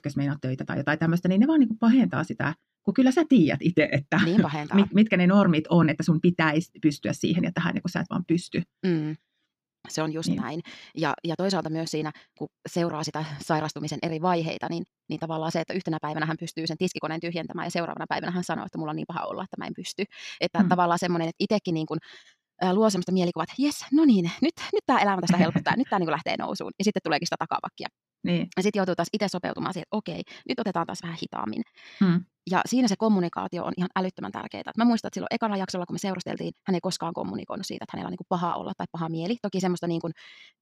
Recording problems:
wrong speed, natural pitch; too fast; 1.5 times normal speed

